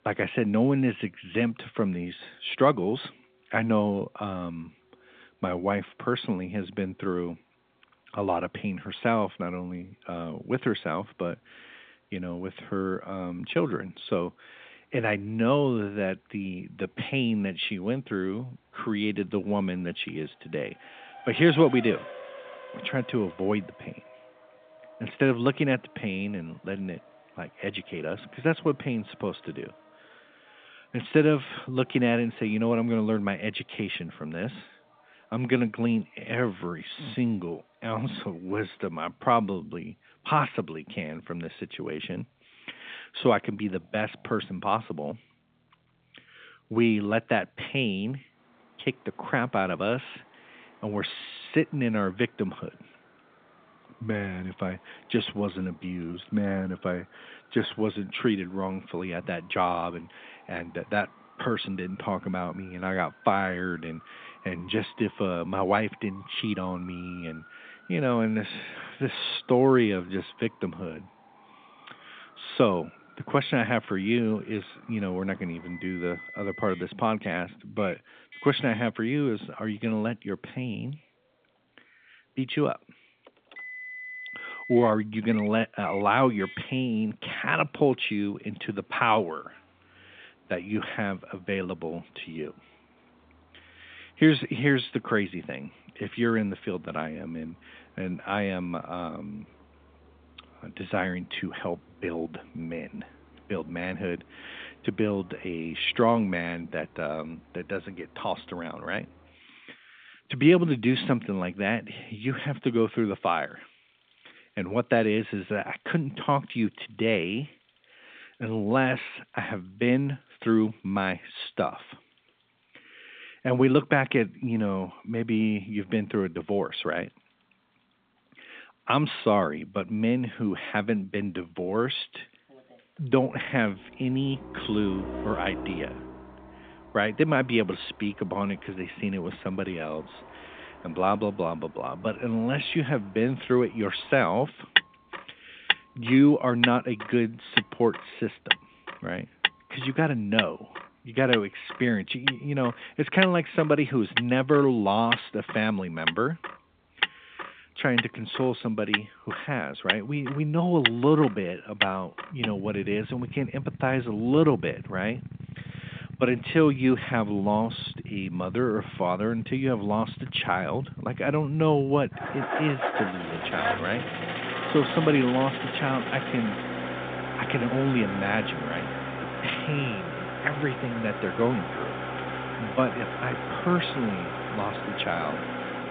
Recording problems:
phone-call audio; nothing above 3.5 kHz
traffic noise; loud; throughout; 5 dB below the speech

